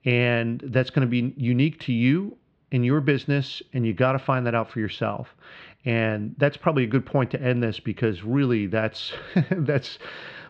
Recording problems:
muffled; slightly; fading above 3.5 kHz

